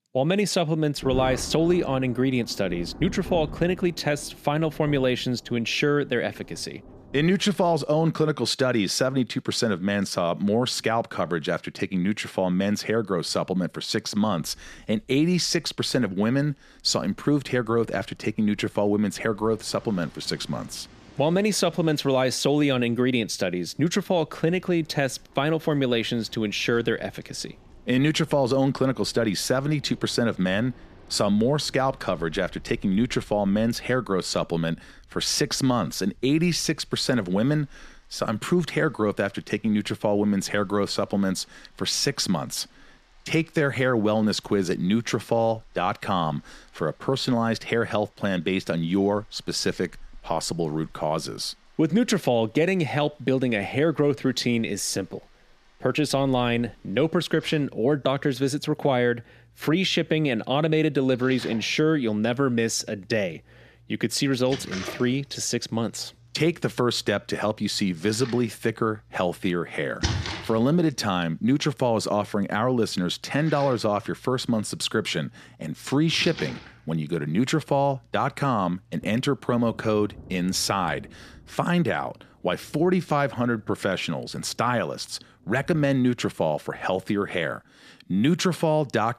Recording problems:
rain or running water; noticeable; throughout; 20 dB below the speech

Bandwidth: 14.5 kHz